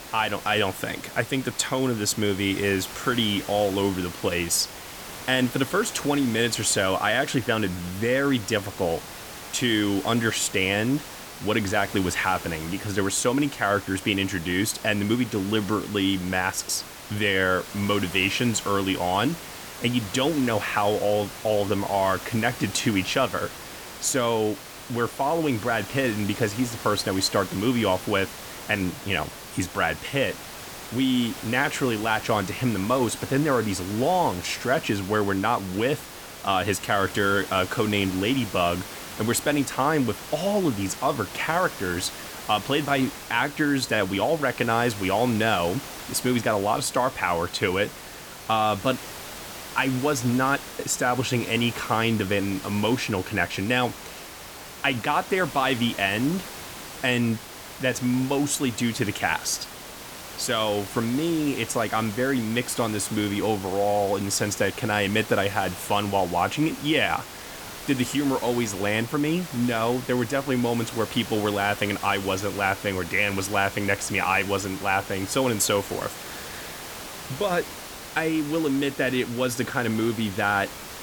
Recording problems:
hiss; noticeable; throughout; 10 dB below the speech

